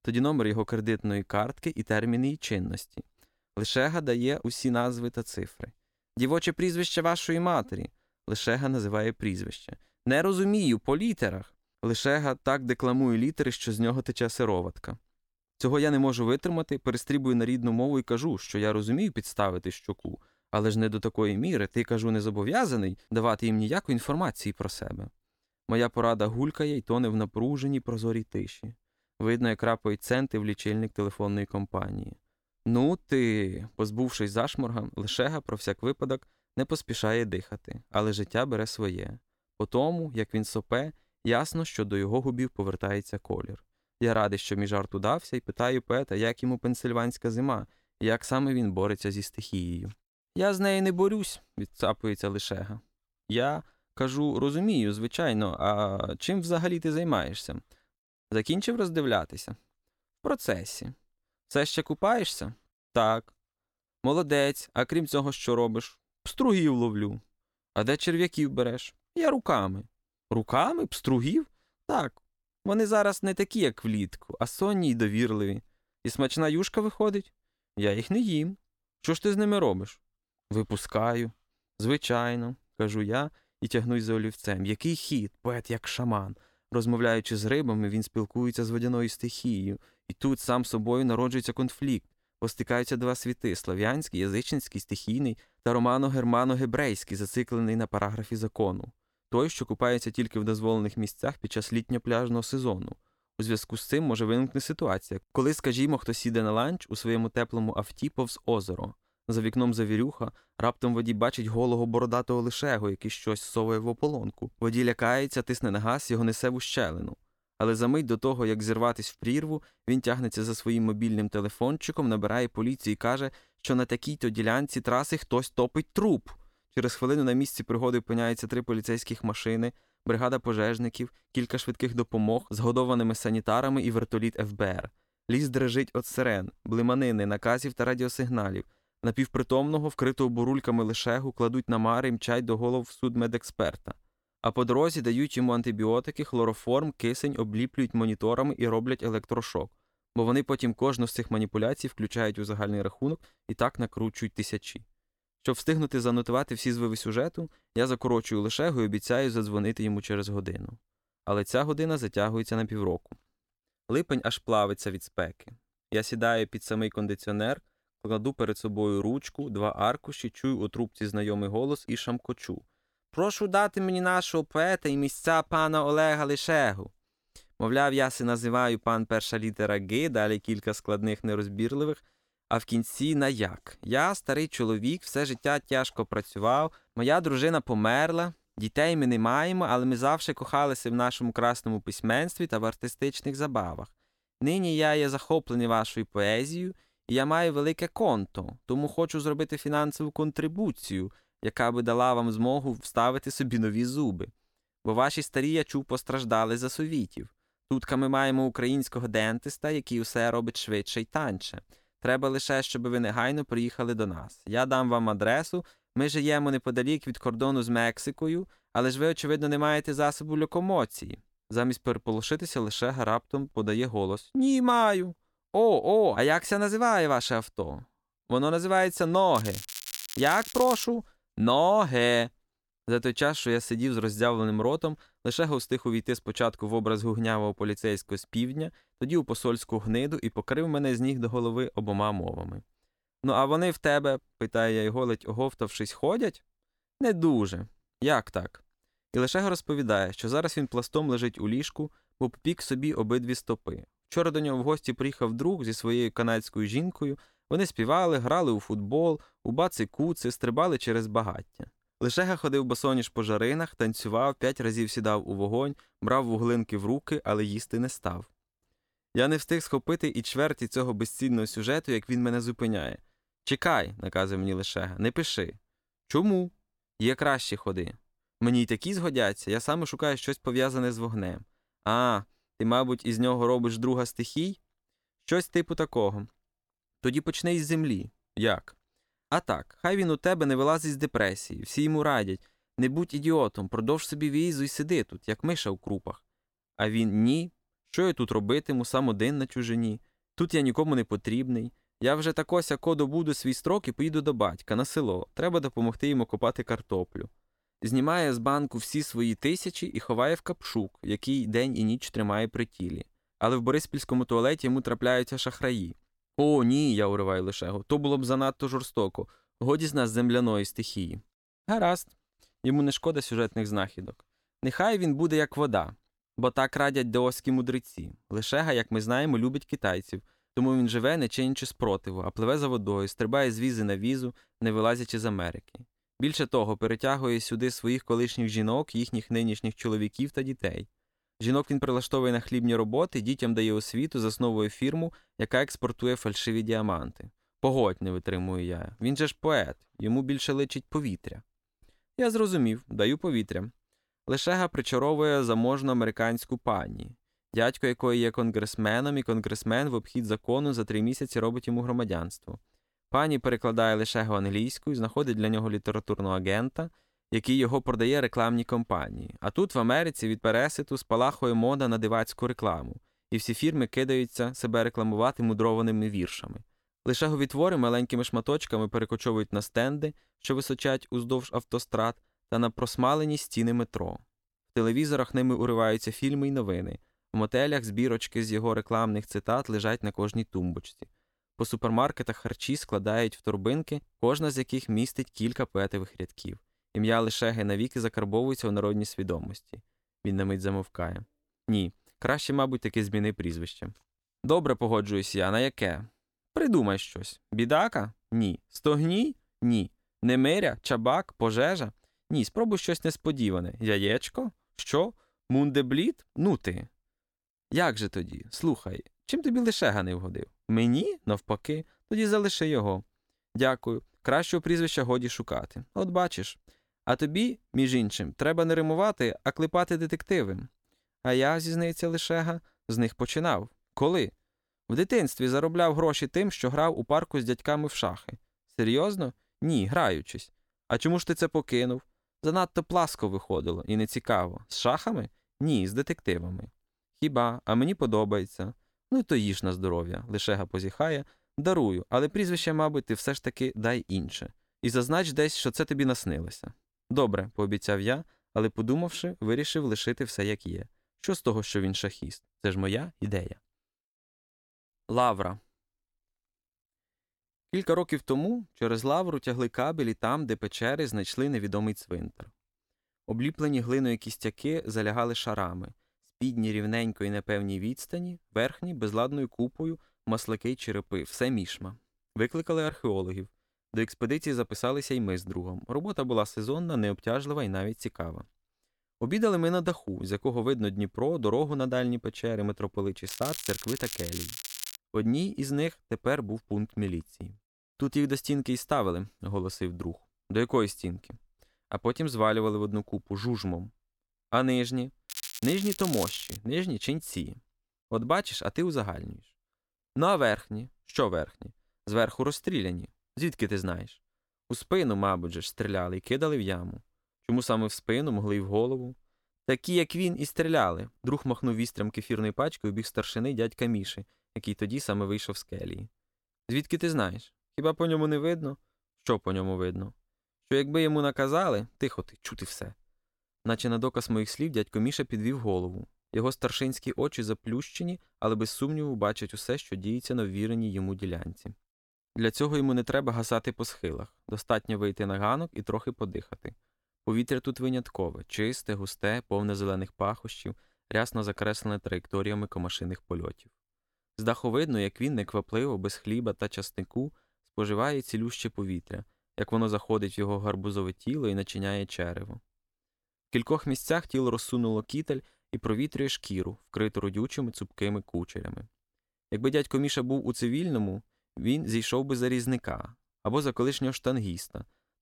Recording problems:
crackling; loud; from 3:49 to 3:51, from 8:13 to 8:15 and from 8:25 to 8:27; 8 dB below the speech

